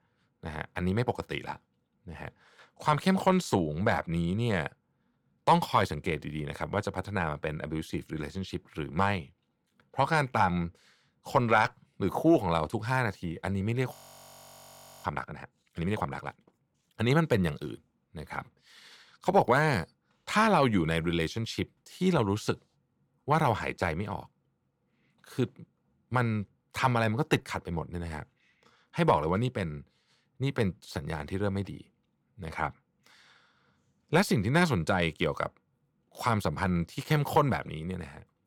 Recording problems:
audio freezing; at 14 s for 1 s

